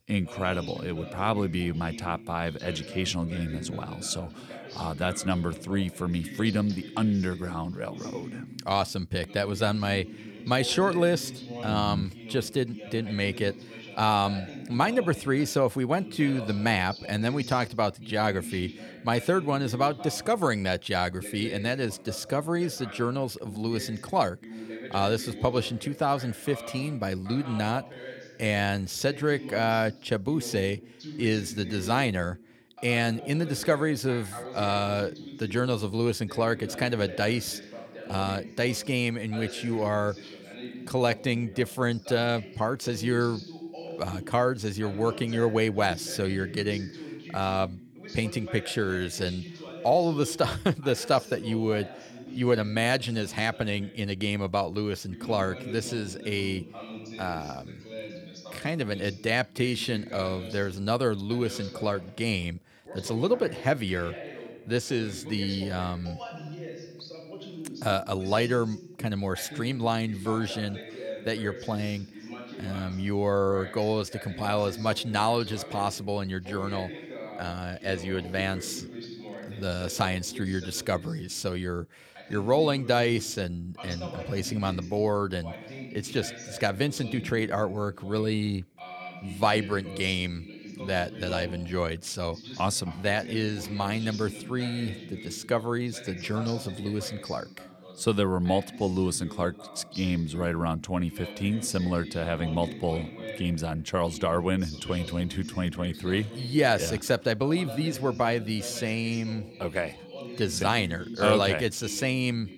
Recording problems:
voice in the background; noticeable; throughout; 15 dB below the speech

